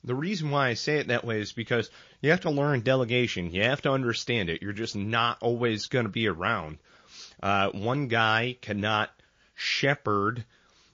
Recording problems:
garbled, watery; slightly; nothing above 6.5 kHz

